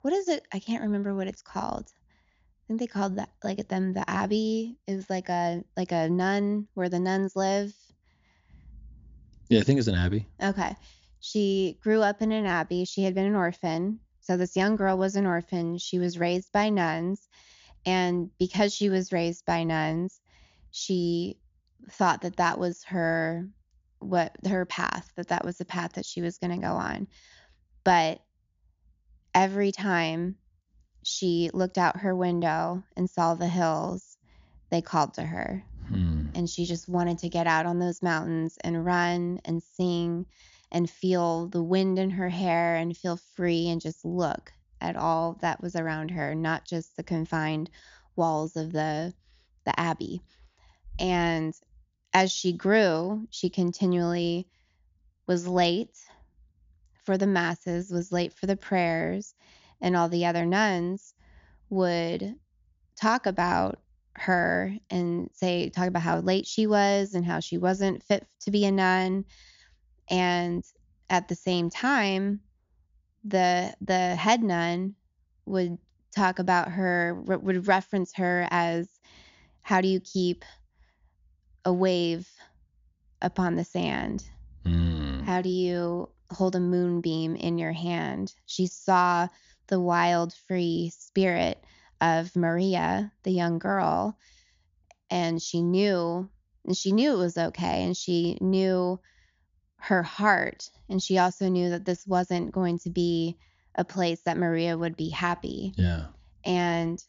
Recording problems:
high frequencies cut off; noticeable; nothing above 7 kHz

